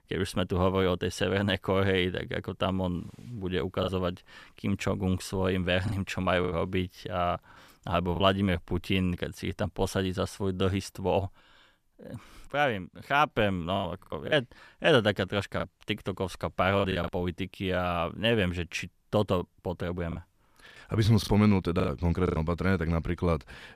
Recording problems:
choppy; very; from 4 to 8 s, from 14 to 17 s and from 20 to 22 s; 10% of the speech affected

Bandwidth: 14.5 kHz